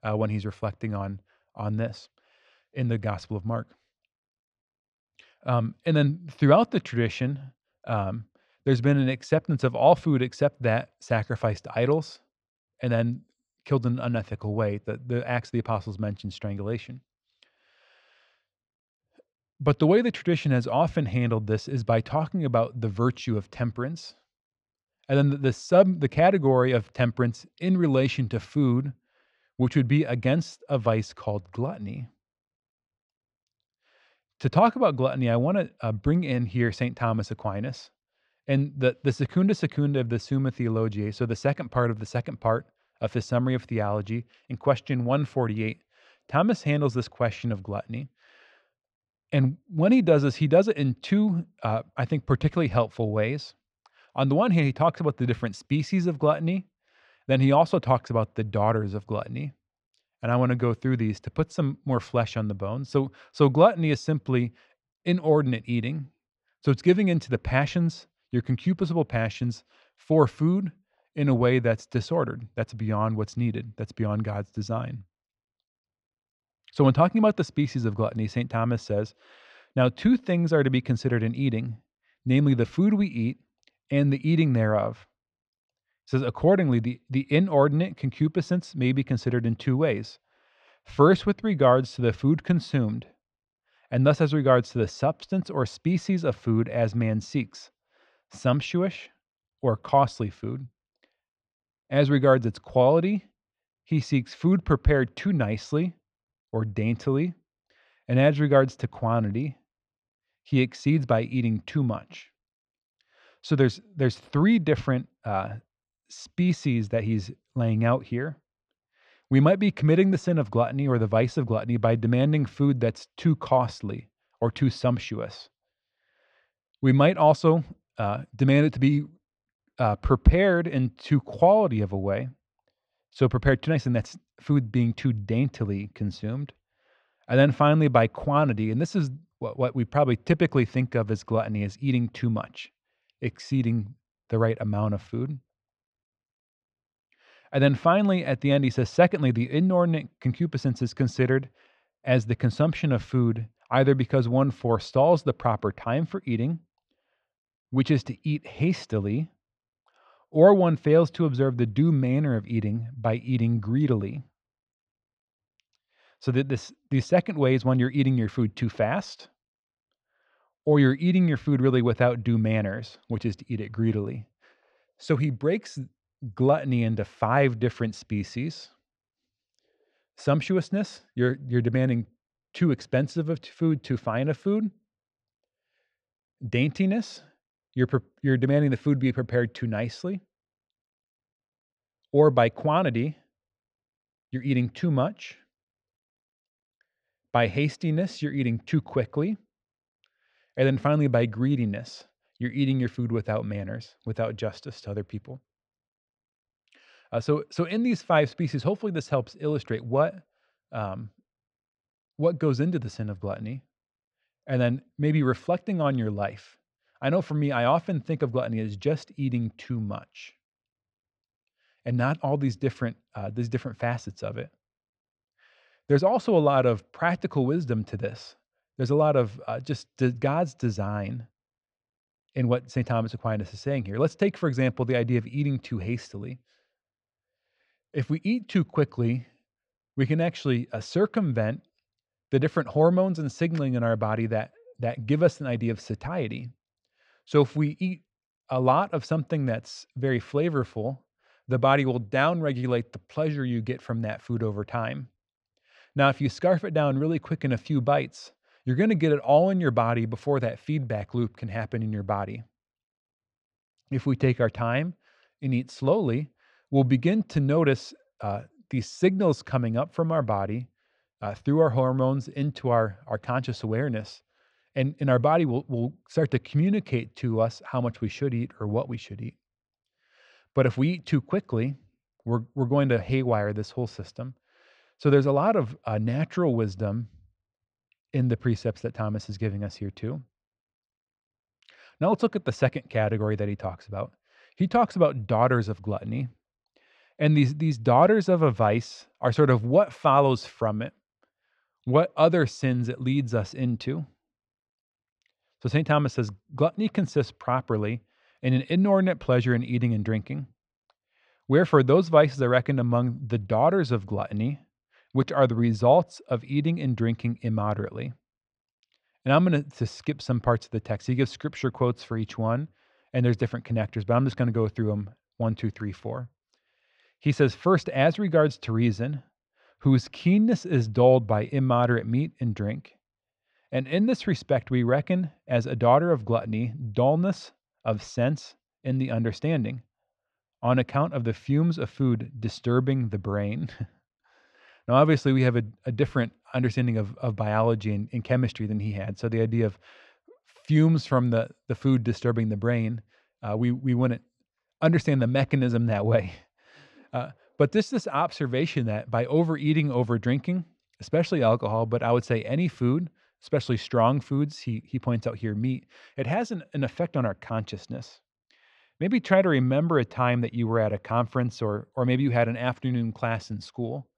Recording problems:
muffled; very; fading above 2.5 kHz

